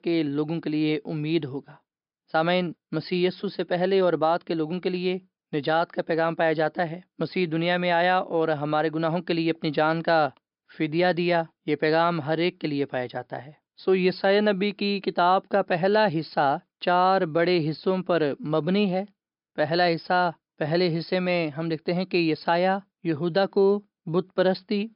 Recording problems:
high frequencies cut off; noticeable; nothing above 5.5 kHz

